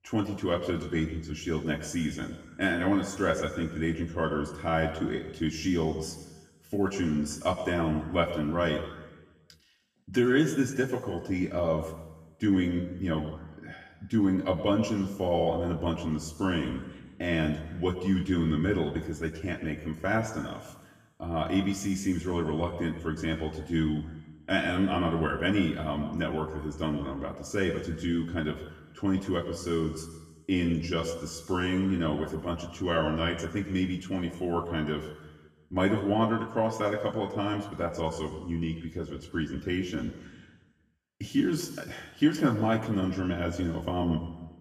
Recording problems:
off-mic speech; far
room echo; slight; dies away in 1.2 s

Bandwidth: 15 kHz